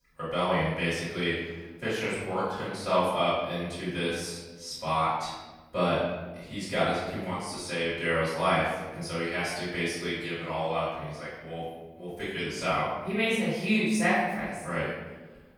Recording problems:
room echo; strong; dies away in 1.1 s
off-mic speech; far

